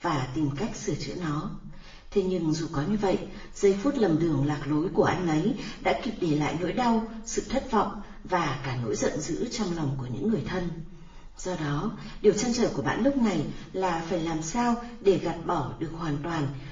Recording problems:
off-mic speech; far
room echo; slight; dies away in 0.6 s
garbled, watery; slightly

